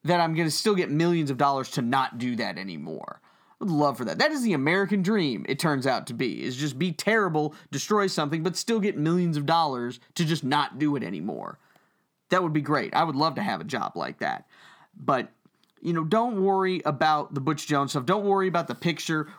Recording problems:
none

